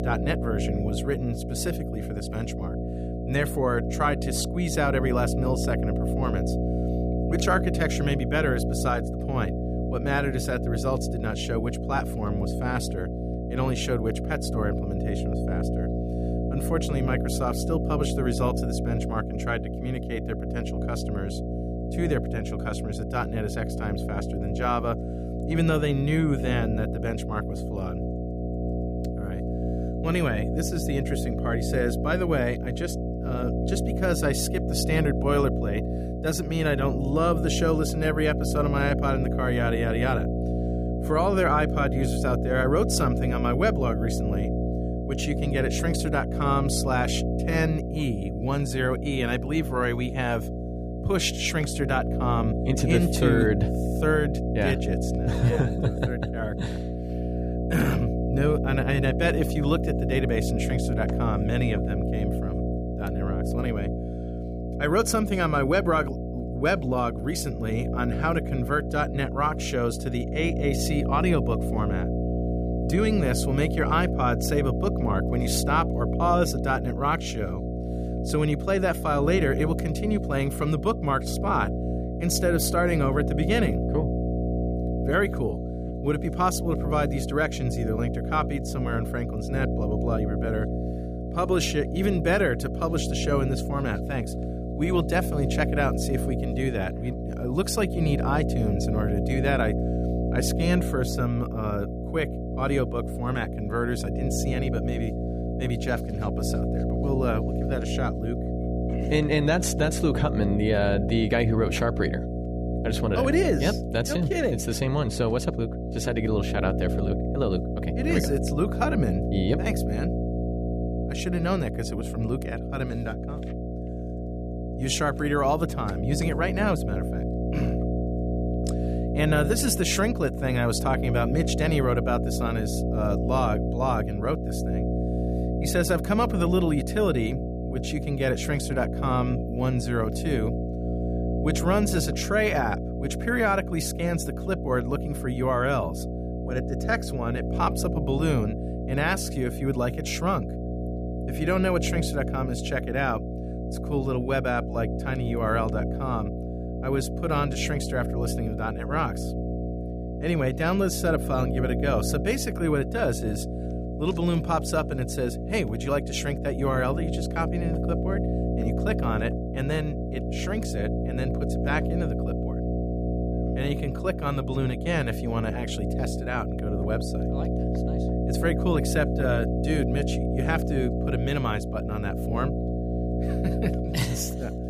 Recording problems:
electrical hum; loud; throughout; 60 Hz, 6 dB below the speech

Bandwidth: 15 kHz